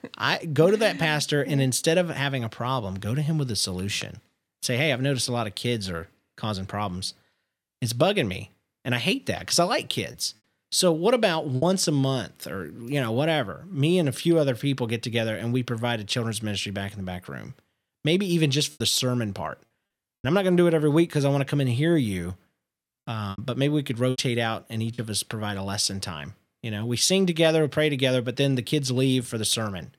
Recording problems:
choppy; very; from 10 to 12 s, from 19 to 20 s and from 23 to 25 s; 9% of the speech affected

